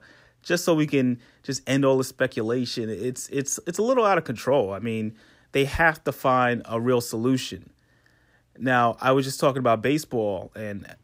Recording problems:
none

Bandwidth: 15.5 kHz